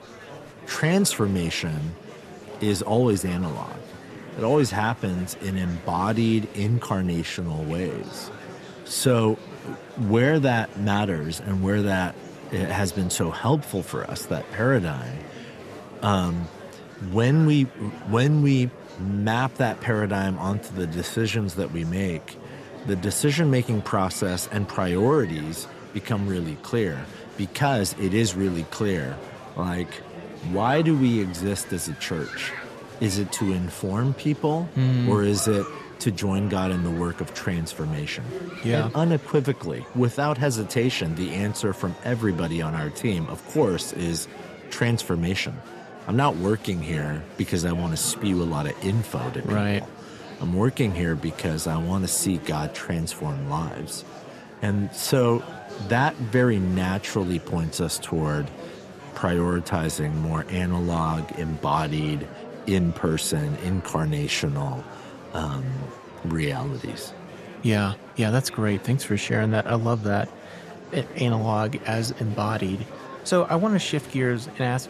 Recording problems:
murmuring crowd; noticeable; throughout; 15 dB below the speech

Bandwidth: 13.5 kHz